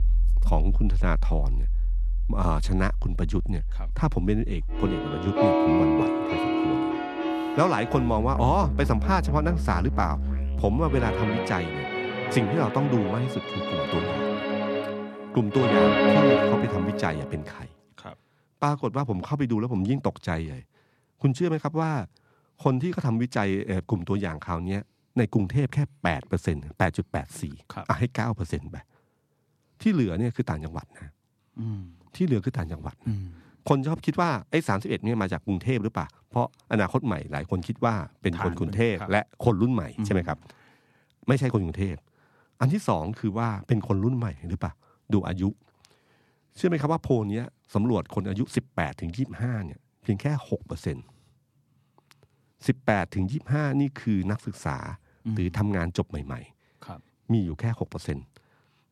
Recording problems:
background music; very loud; until 17 s; 1 dB above the speech

